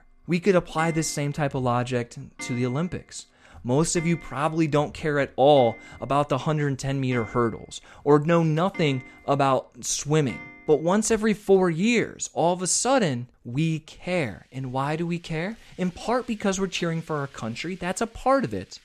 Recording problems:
household noises; noticeable; throughout; 20 dB below the speech

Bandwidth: 13.5 kHz